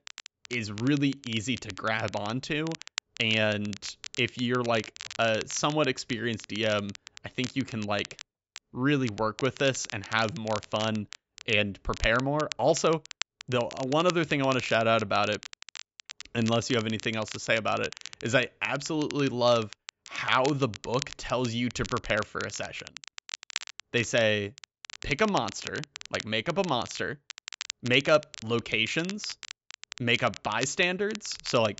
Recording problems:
high frequencies cut off; noticeable; nothing above 8 kHz
crackle, like an old record; noticeable; 15 dB below the speech

